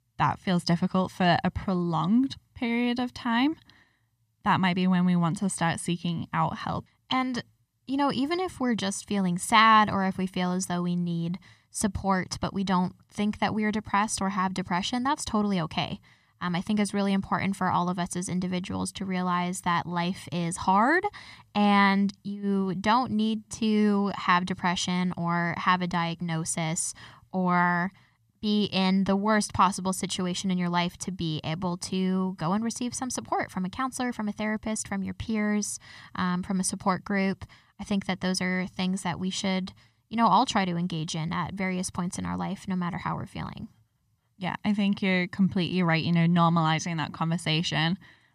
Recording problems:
none

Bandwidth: 14.5 kHz